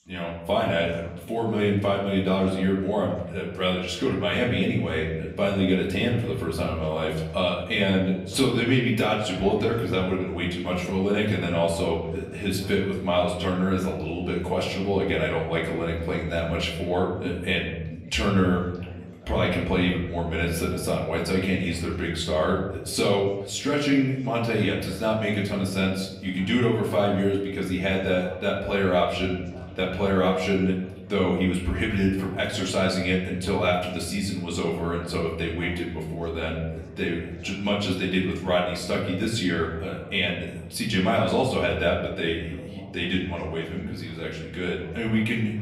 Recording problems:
off-mic speech; far
room echo; slight; dies away in 0.9 s
background chatter; faint; throughout; 3 voices, 20 dB below the speech

